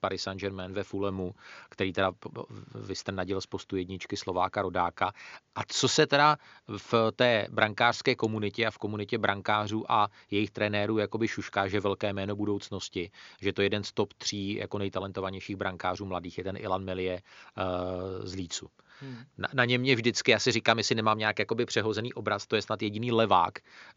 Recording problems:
high frequencies cut off; noticeable; nothing above 7 kHz

